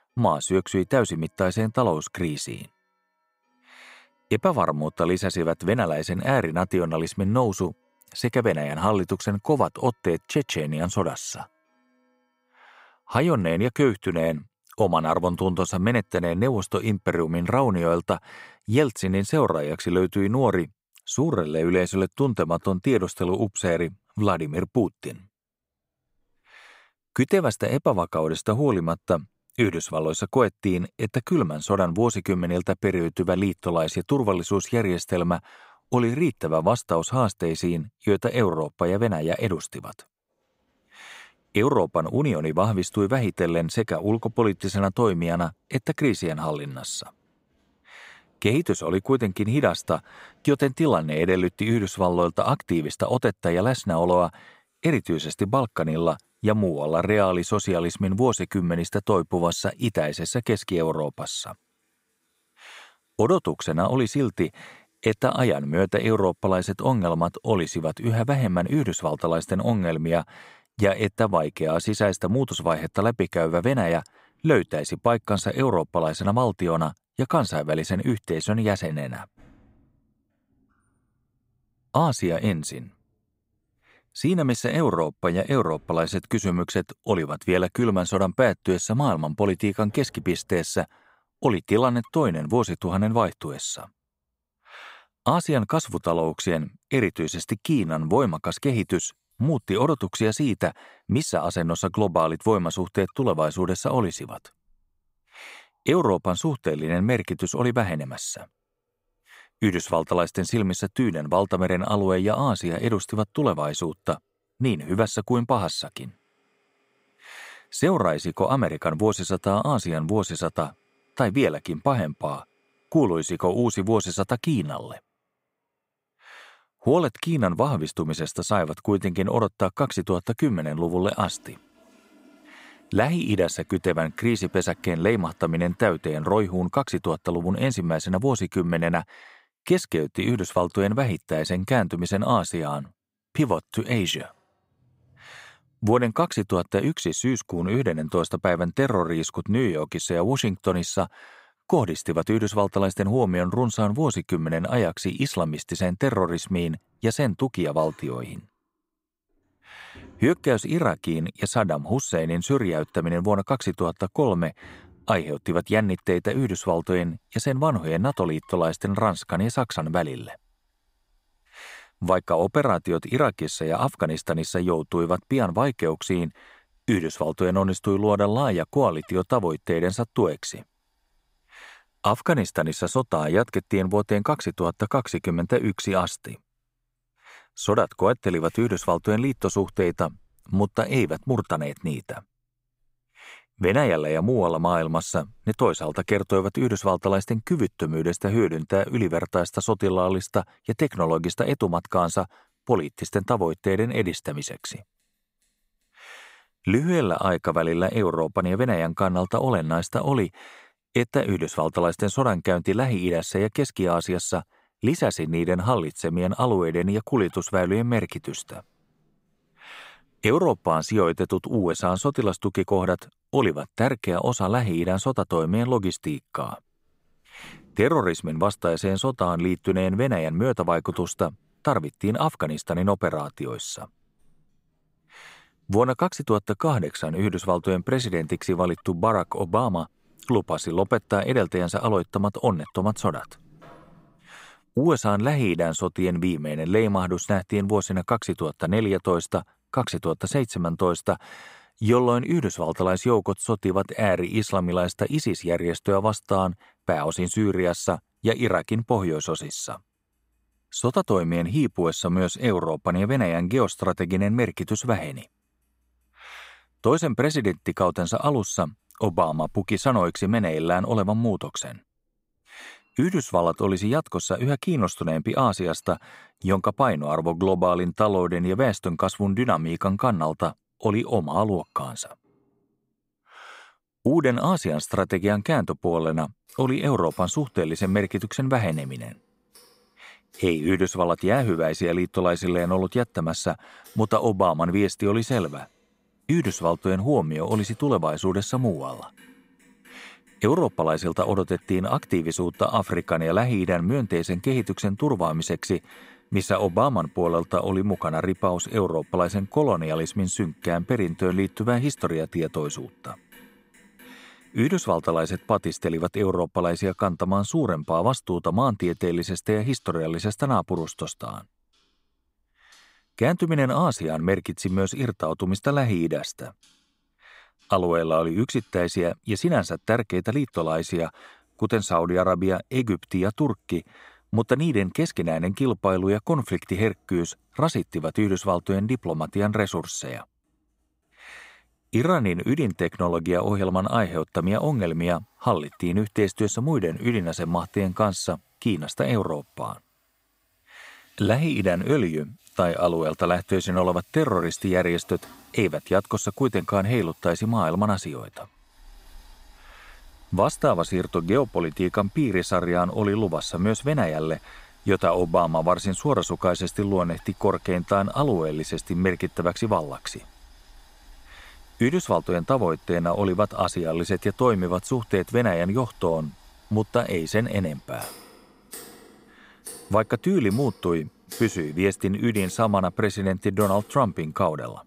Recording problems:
household noises; faint; throughout; 30 dB below the speech

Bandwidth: 15.5 kHz